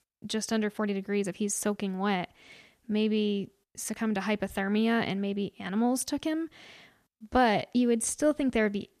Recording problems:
uneven, jittery; slightly; from 0.5 to 8.5 s

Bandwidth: 14.5 kHz